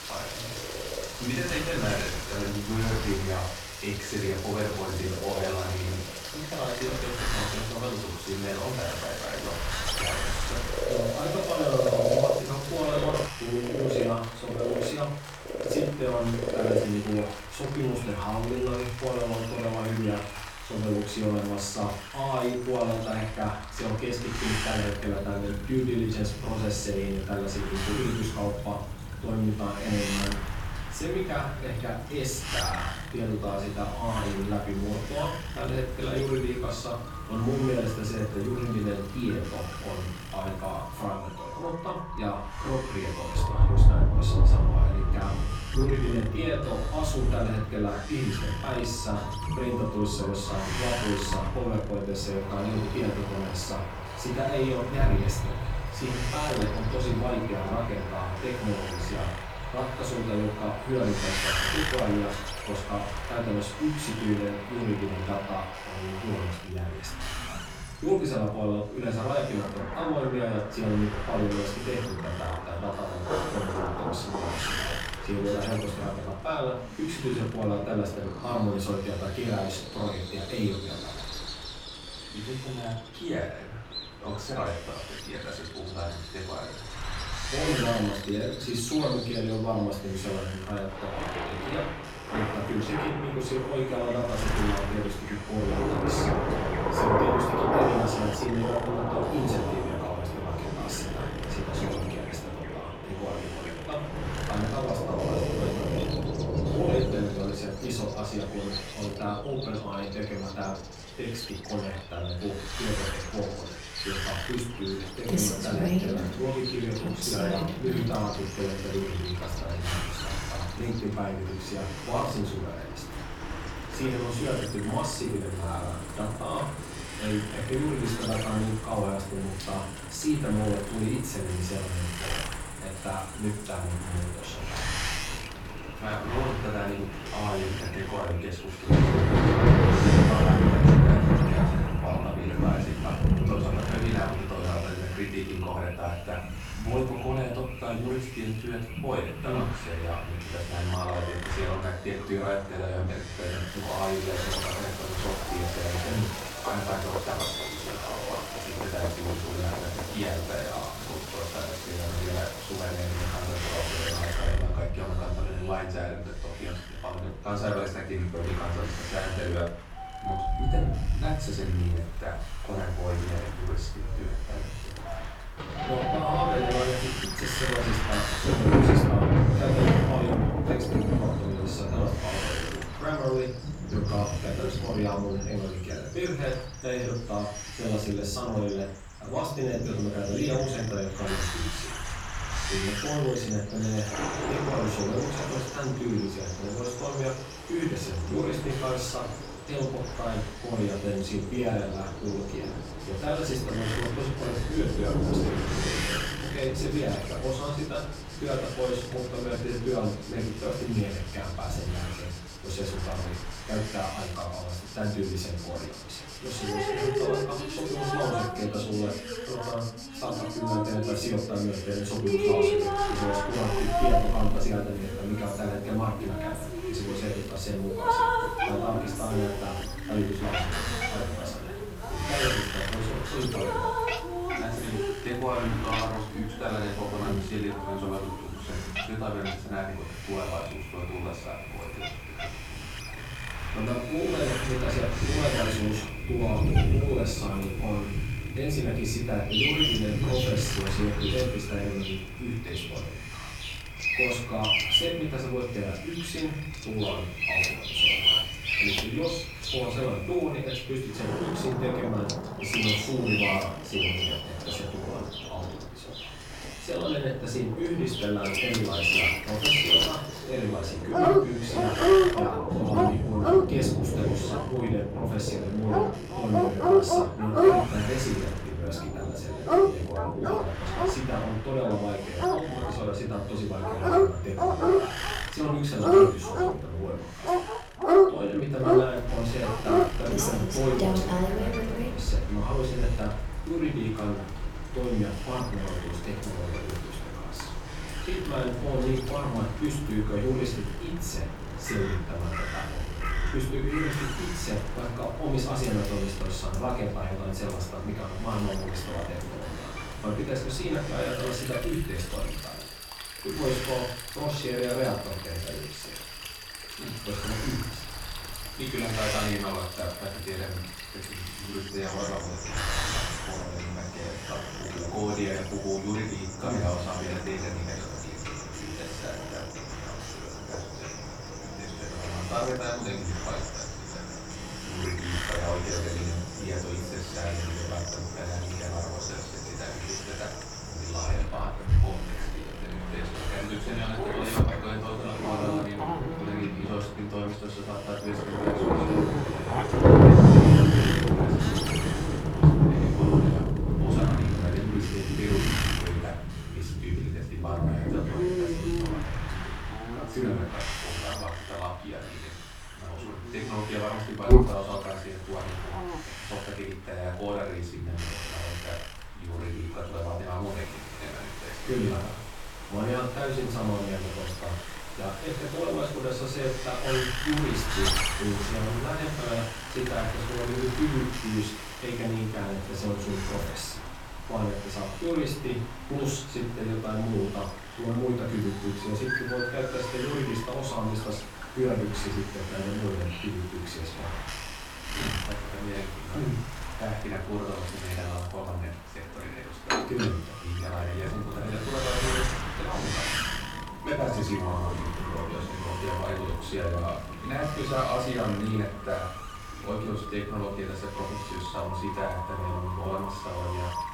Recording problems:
off-mic speech; far
room echo; noticeable; dies away in 0.5 s
rain or running water; very loud; throughout; 1 dB above the speech
wind noise on the microphone; heavy; 5 dB below the speech
animal sounds; loud; throughout; 1 dB below the speech

